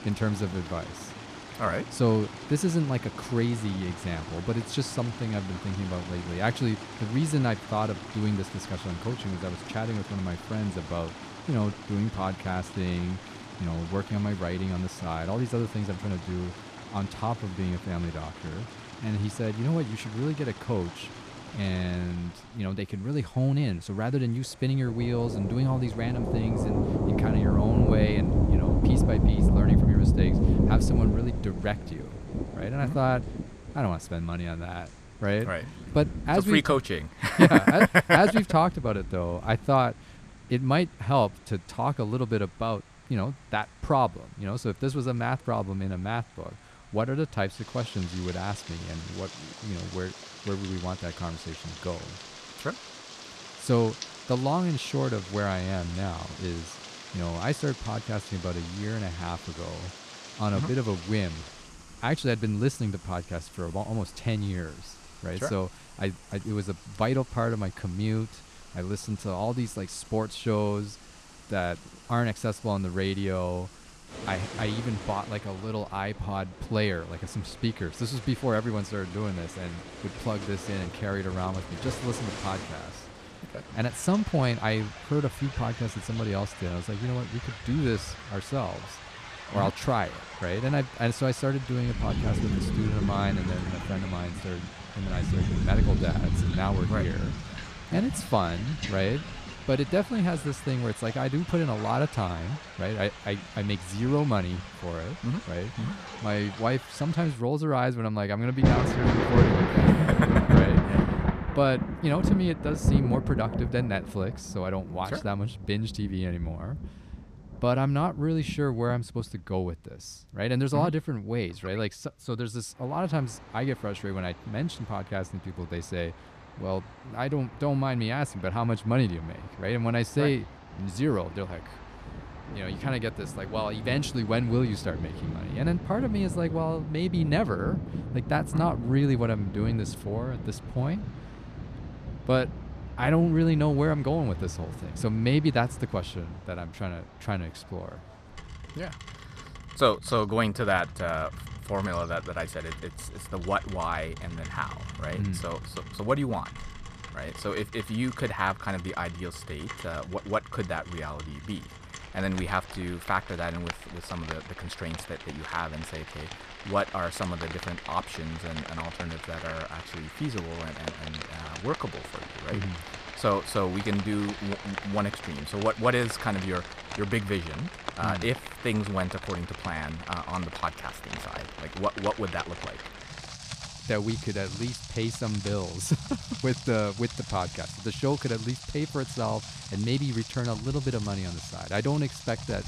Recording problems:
rain or running water; loud; throughout; 4 dB below the speech

